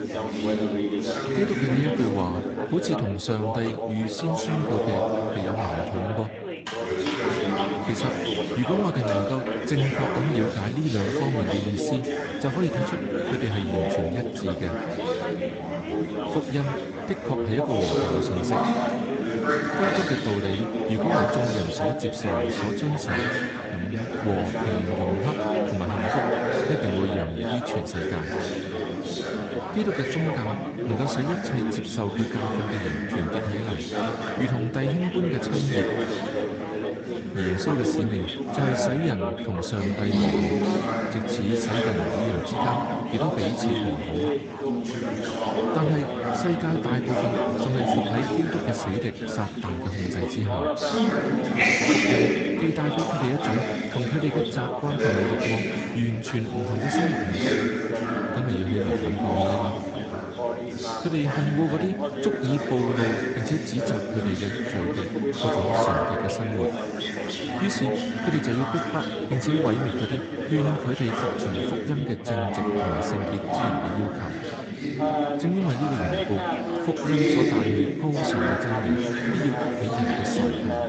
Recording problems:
garbled, watery; slightly; nothing above 8 kHz
chatter from many people; very loud; throughout; 2 dB above the speech

